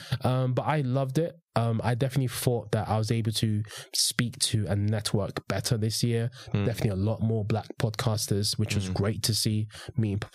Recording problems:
squashed, flat; somewhat

